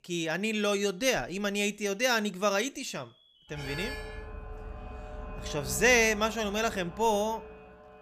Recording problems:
alarms or sirens; noticeable; throughout; 15 dB below the speech

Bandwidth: 14.5 kHz